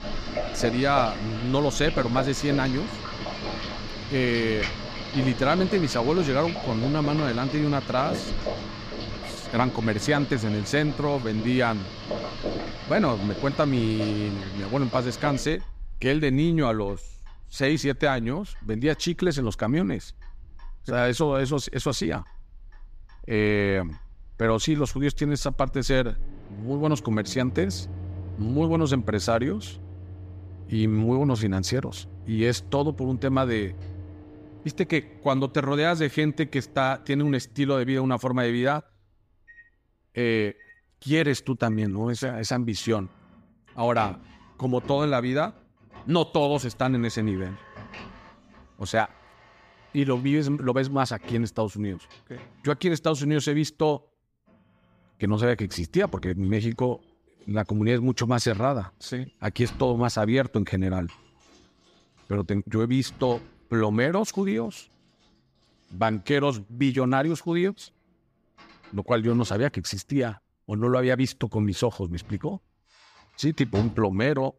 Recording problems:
household noises; noticeable; throughout; 10 dB below the speech

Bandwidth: 15 kHz